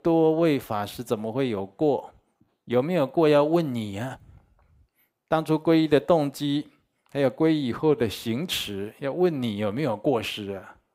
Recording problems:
none

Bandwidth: 15.5 kHz